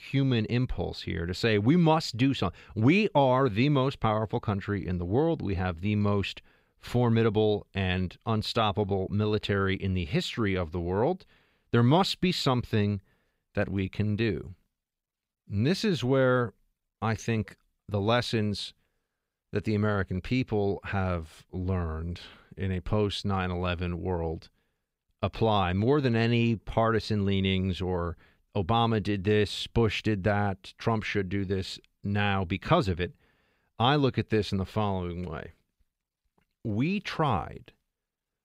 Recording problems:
none

